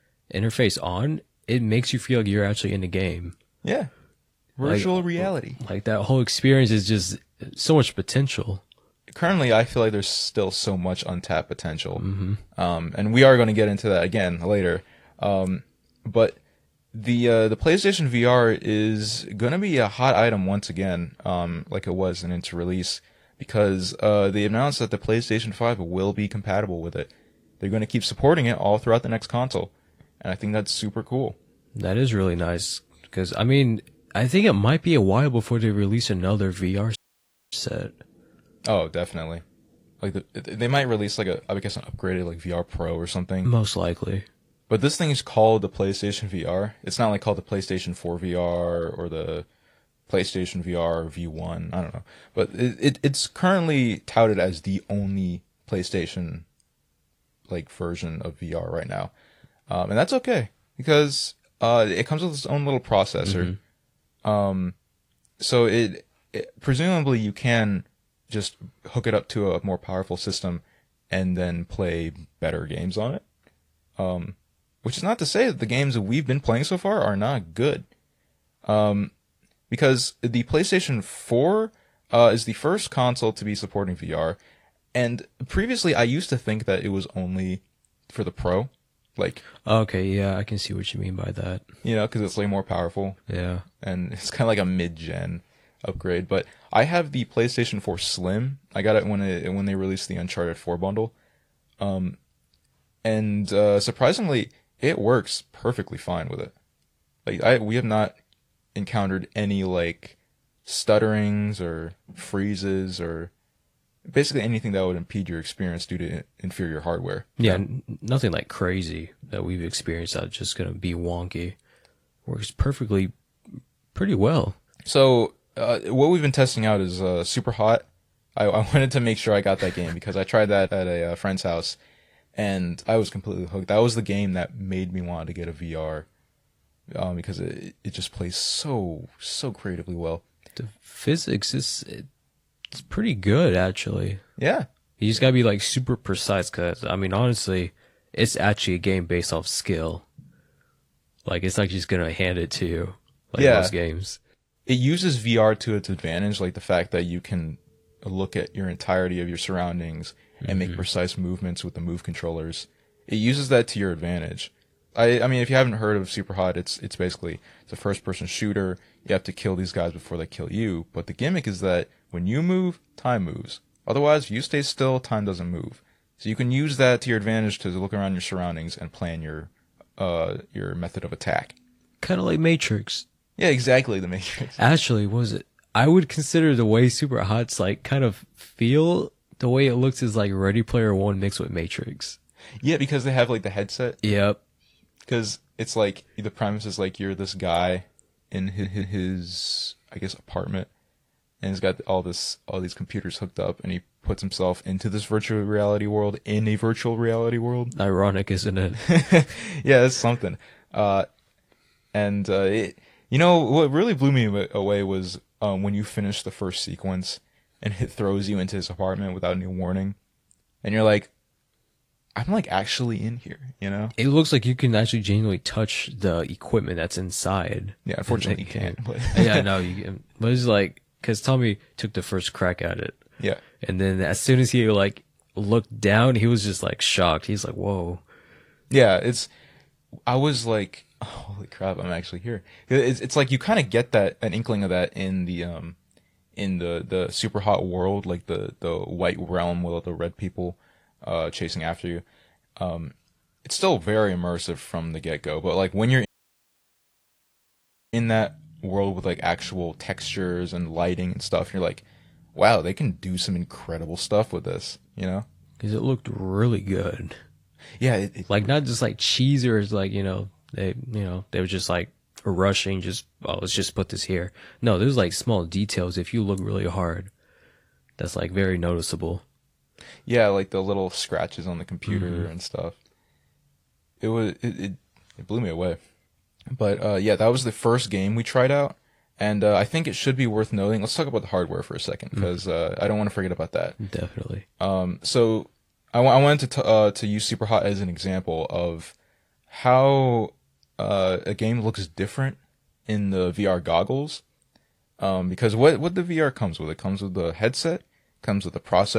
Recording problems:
garbled, watery; slightly; nothing above 15 kHz
audio cutting out; at 37 s for 0.5 s and at 4:16 for 2 s
audio stuttering; at 3:18
abrupt cut into speech; at the end

